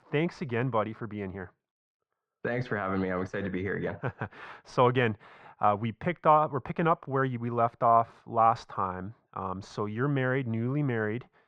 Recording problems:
muffled; very; fading above 1.5 kHz

